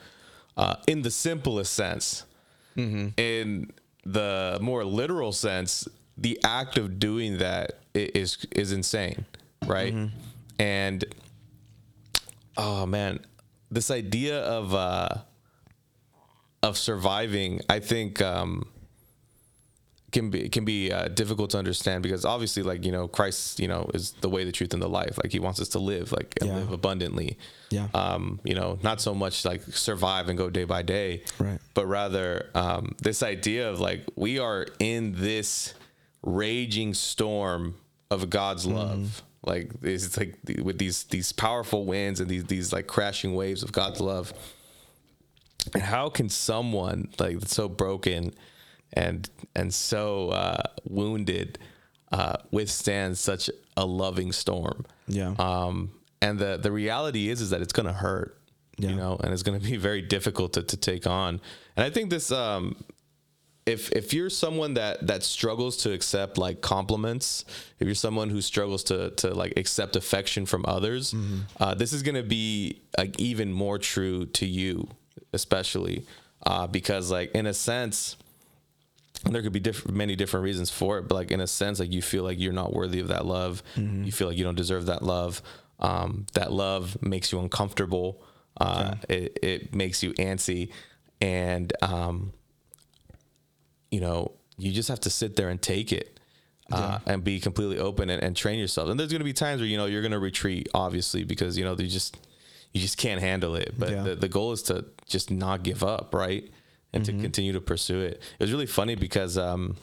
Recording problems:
squashed, flat; heavily

